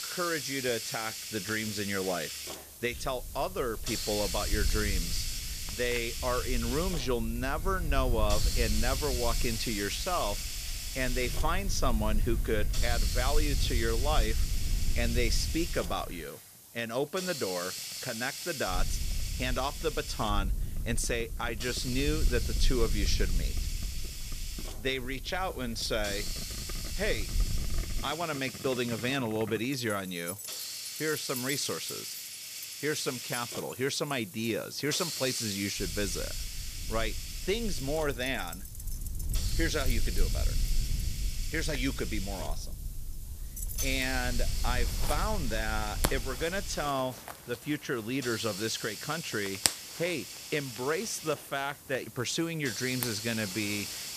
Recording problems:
hiss; loud; throughout; 5 dB below the speech
household noises; noticeable; throughout; 10 dB below the speech
low rumble; faint; from 3 to 16 s, from 19 to 28 s and from 36 to 47 s; 20 dB below the speech

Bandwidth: 14.5 kHz